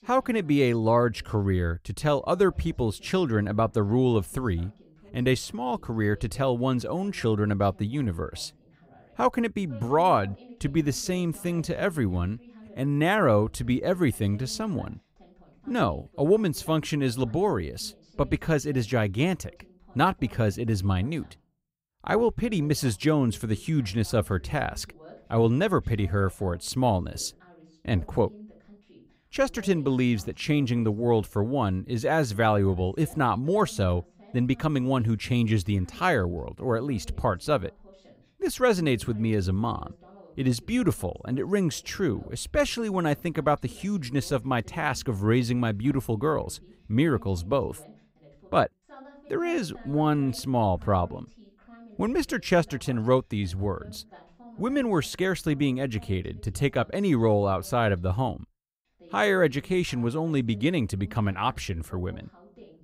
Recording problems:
voice in the background; faint; throughout; 25 dB below the speech

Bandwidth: 15.5 kHz